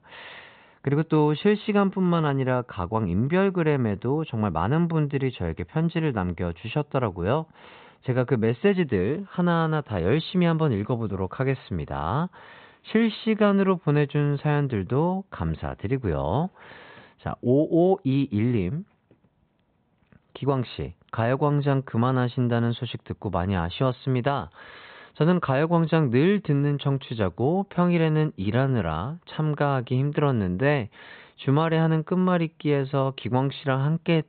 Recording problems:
high frequencies cut off; severe; nothing above 4 kHz

